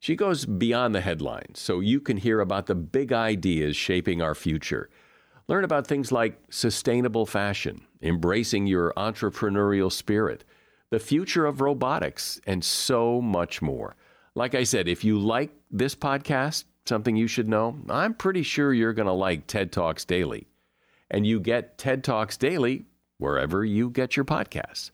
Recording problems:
none

